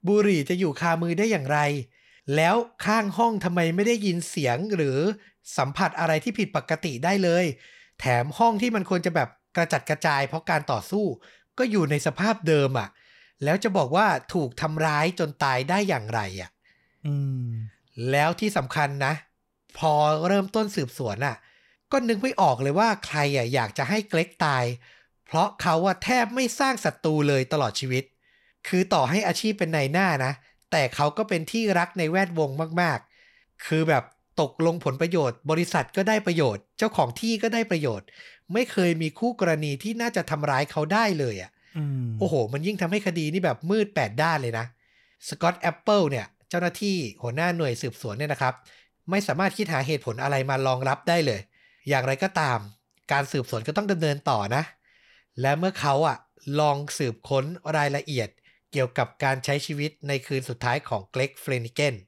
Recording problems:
none

